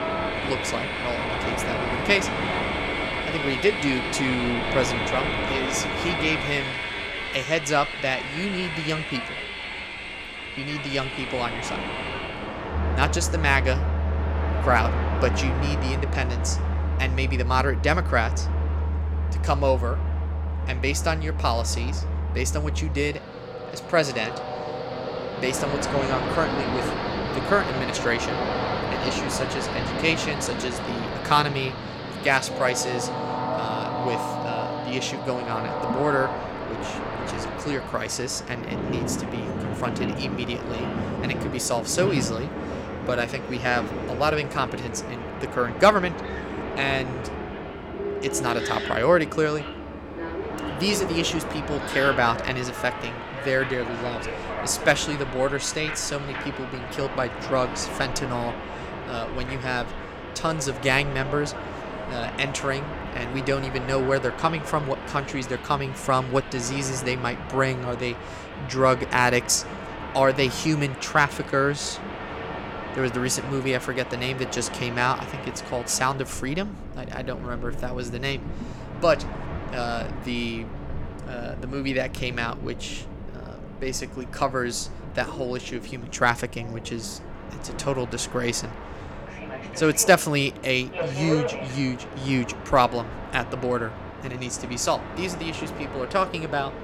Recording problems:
train or aircraft noise; loud; throughout; 4 dB below the speech

